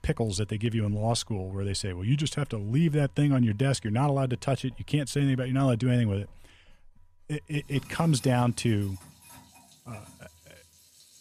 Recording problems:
household noises; faint; throughout; 25 dB below the speech

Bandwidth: 14.5 kHz